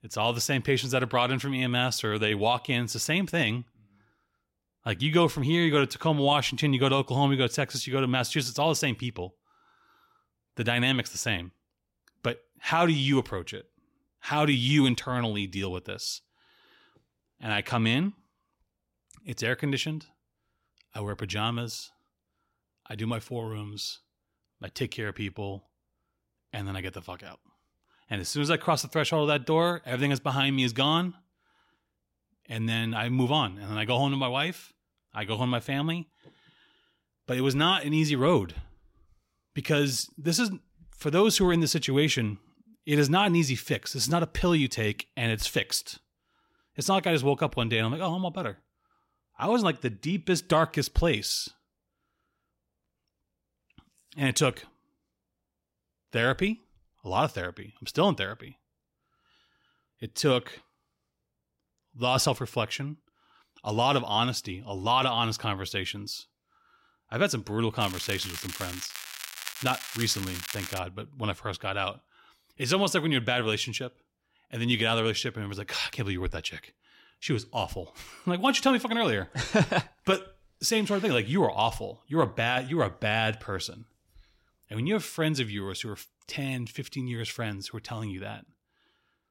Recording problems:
crackling; loud; from 1:08 to 1:11; 10 dB below the speech

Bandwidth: 16 kHz